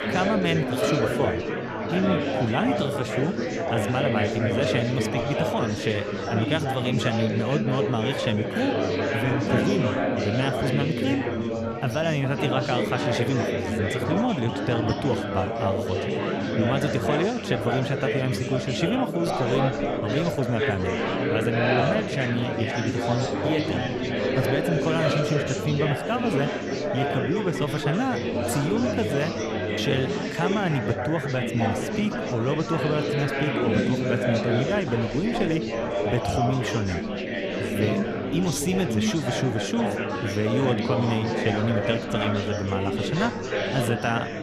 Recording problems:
chatter from many people; very loud; throughout; 1 dB above the speech

